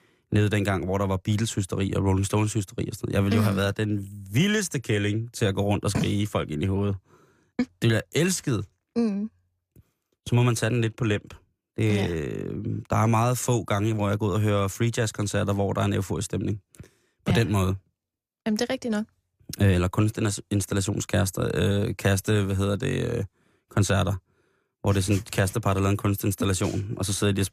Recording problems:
none

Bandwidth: 15 kHz